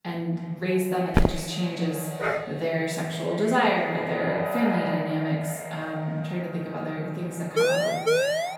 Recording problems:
echo of what is said; strong; throughout; 280 ms later, 8 dB below the speech
off-mic speech; far
room echo; noticeable; dies away in 0.9 s
footsteps; loud; at 1 s; peak 3 dB above the speech
dog barking; noticeable; at 2 s; peak 1 dB below the speech
siren; loud; from 7.5 s on; peak 5 dB above the speech

